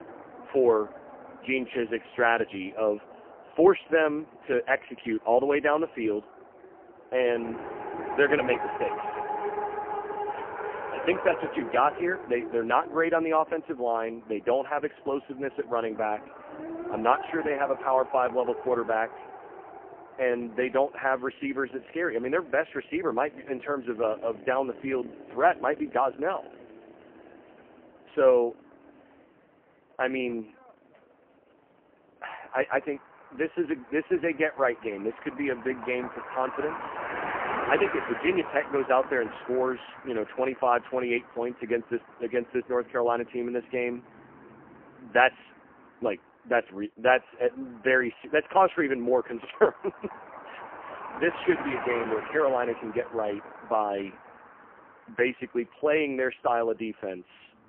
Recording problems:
phone-call audio; poor line; nothing above 3 kHz
traffic noise; noticeable; throughout; 10 dB below the speech

